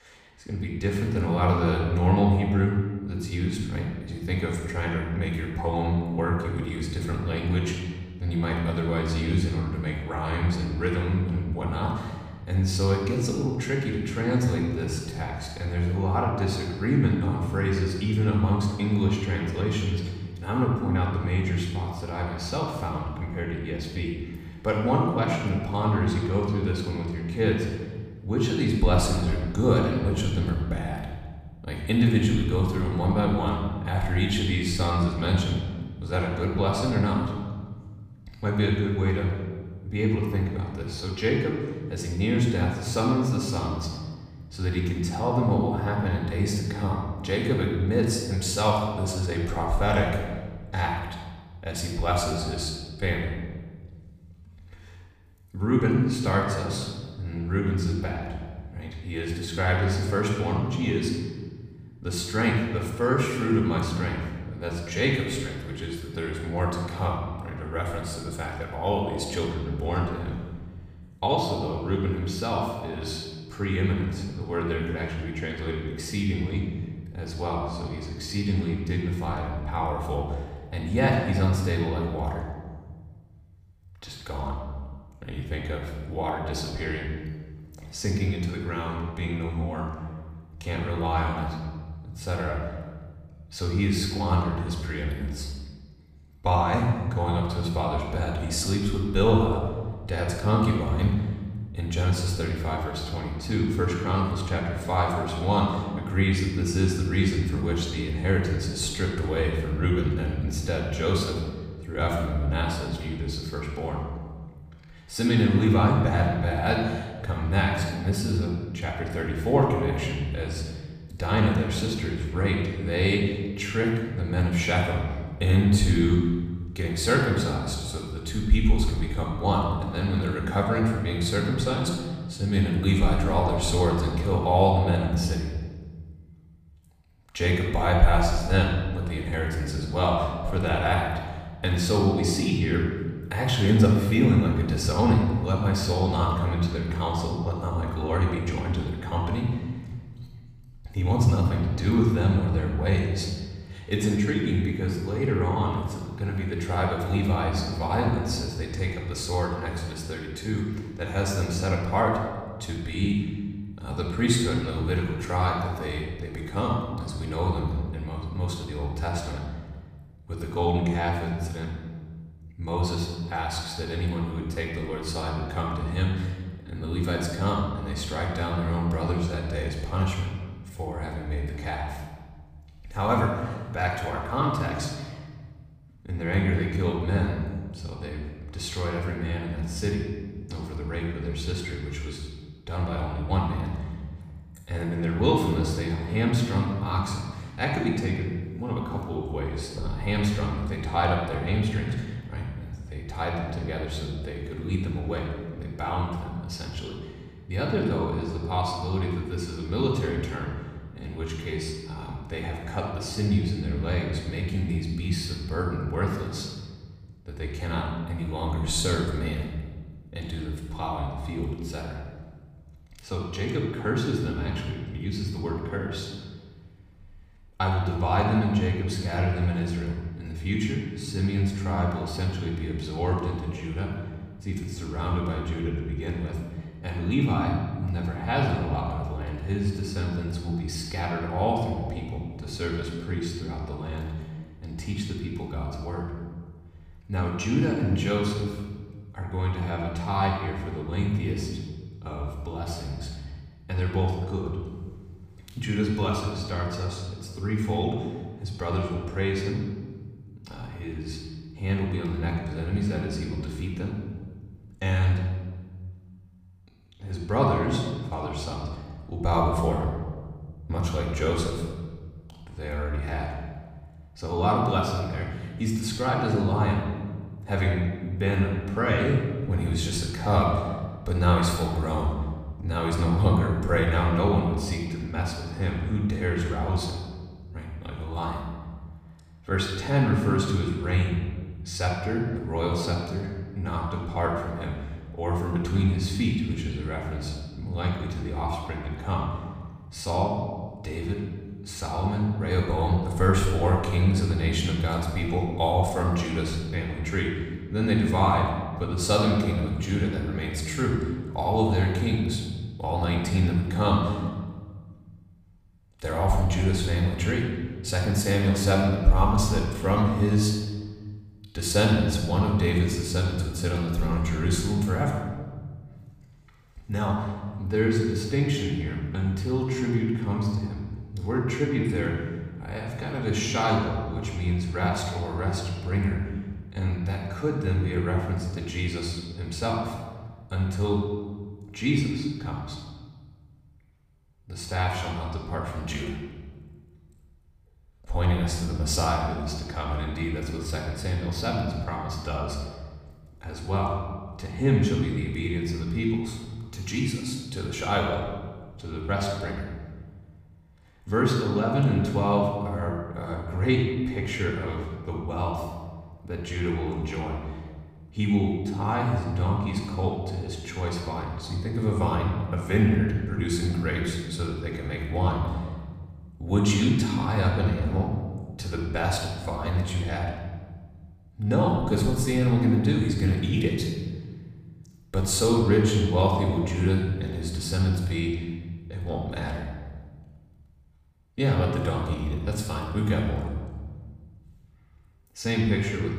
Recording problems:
off-mic speech; far
room echo; noticeable; dies away in 1.4 s

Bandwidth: 15 kHz